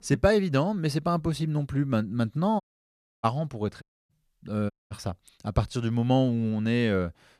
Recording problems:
audio cutting out; at 2.5 s for 0.5 s, at 4 s and at 4.5 s

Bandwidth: 14.5 kHz